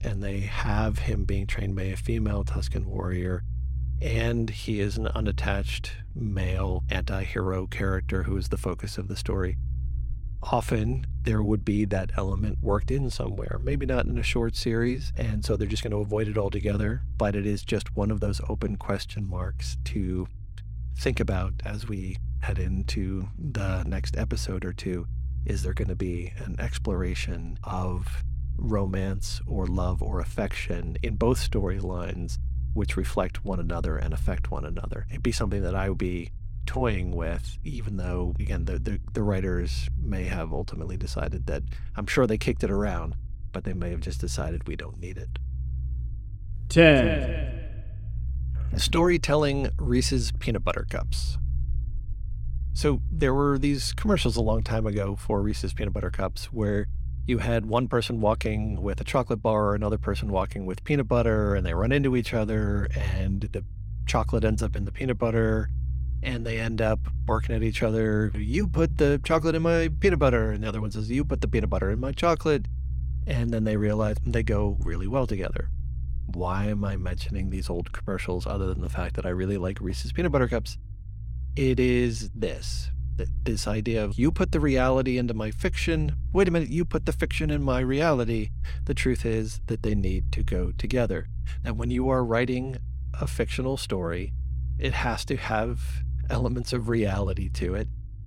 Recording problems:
low rumble; faint; throughout; 20 dB below the speech

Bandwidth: 16.5 kHz